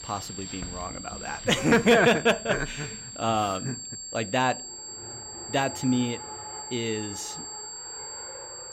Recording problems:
high-pitched whine; noticeable; throughout; 7.5 kHz, 10 dB below the speech
traffic noise; noticeable; throughout; 20 dB below the speech

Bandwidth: 16 kHz